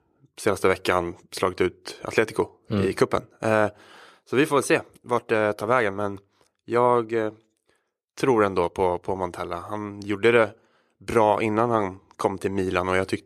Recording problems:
none

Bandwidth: 14.5 kHz